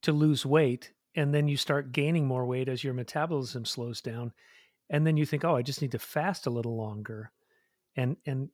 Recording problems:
none

